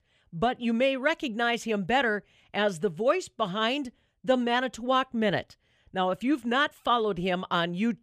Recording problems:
none

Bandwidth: 15 kHz